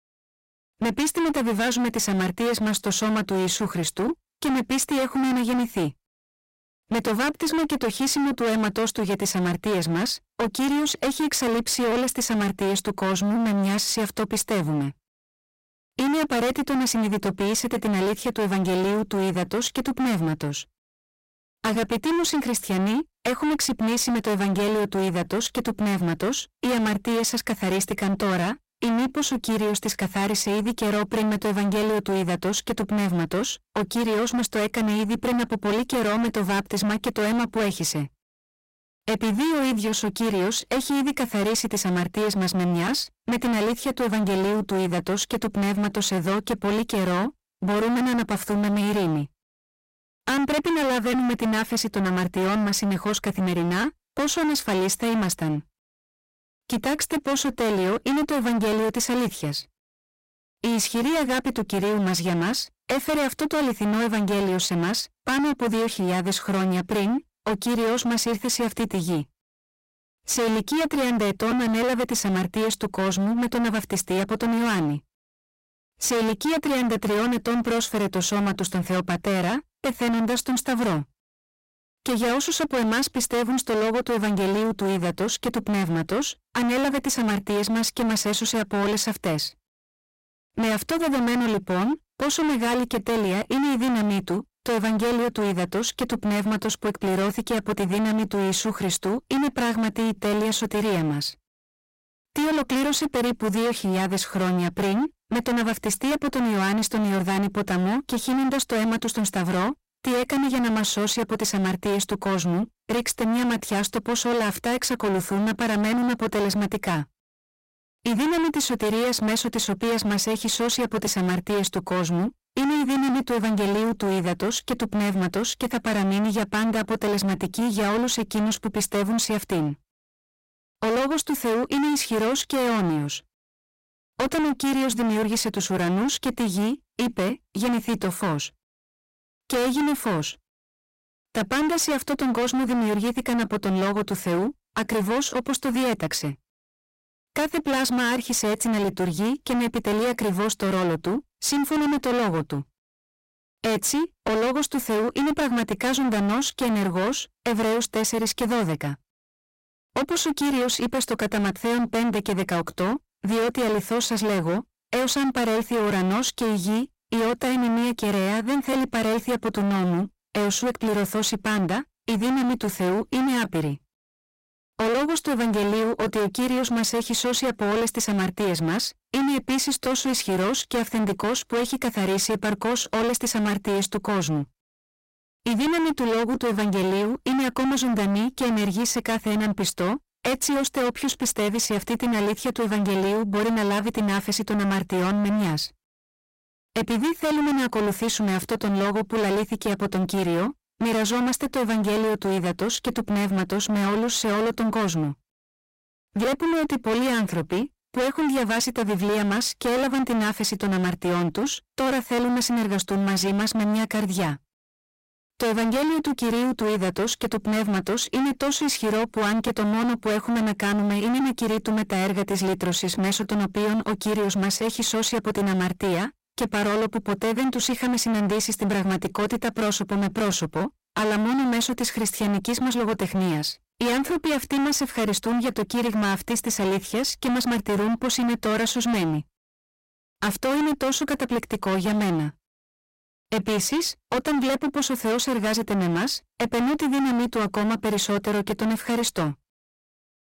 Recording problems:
distortion; heavy; 34% of the sound clipped

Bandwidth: 16 kHz